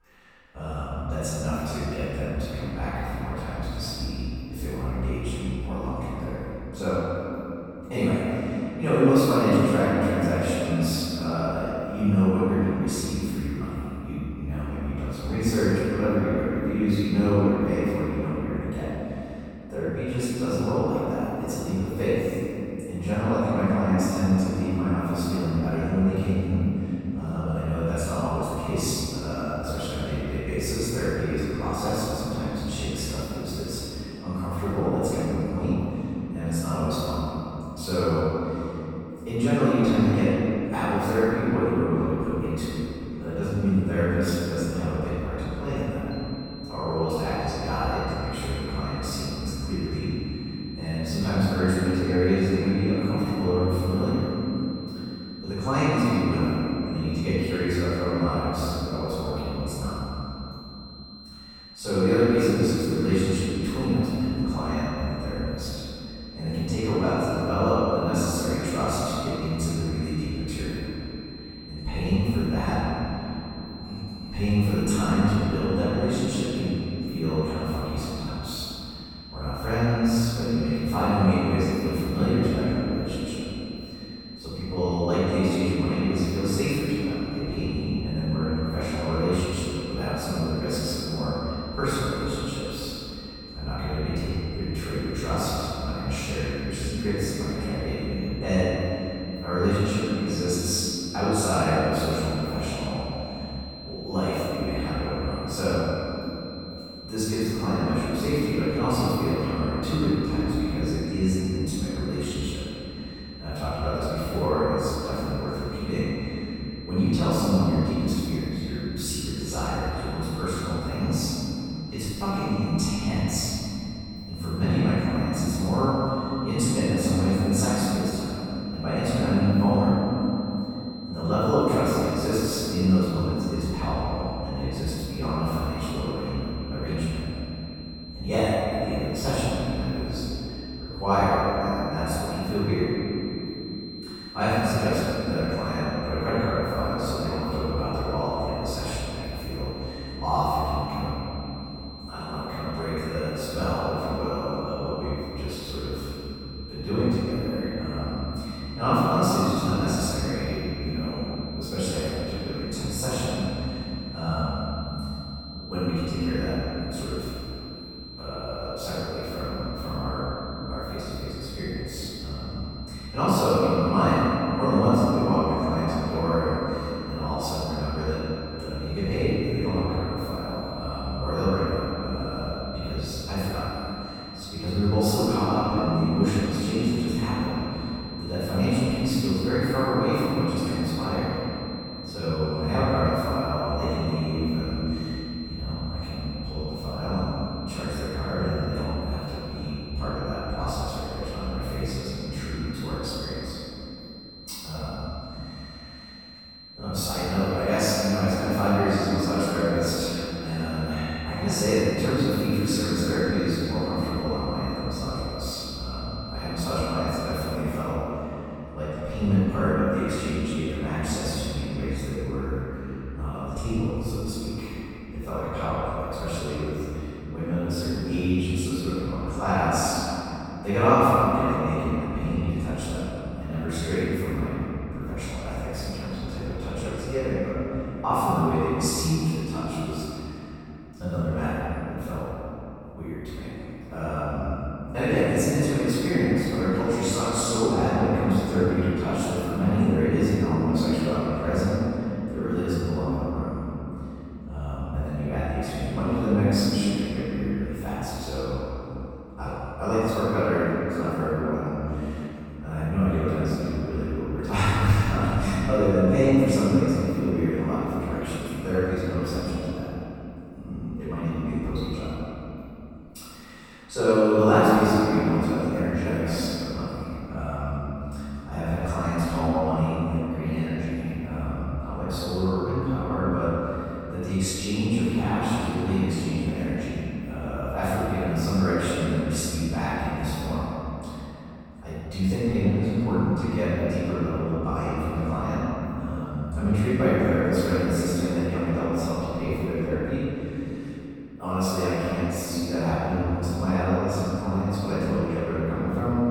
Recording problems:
room echo; strong; dies away in 3 s
off-mic speech; far
high-pitched whine; noticeable; from 46 s to 3:38; 4 kHz, 15 dB below the speech

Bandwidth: 18.5 kHz